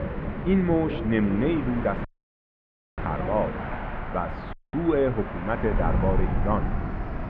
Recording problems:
muffled; very; fading above 2 kHz
train or aircraft noise; loud; throughout; 7 dB below the speech
wind noise on the microphone; occasional gusts; 15 dB below the speech
audio cutting out; at 2 s for 1 s and at 4.5 s

